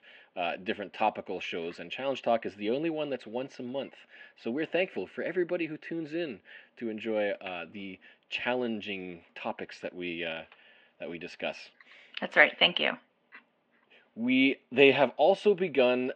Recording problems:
muffled; very; fading above 2.5 kHz
thin; somewhat; fading below 550 Hz

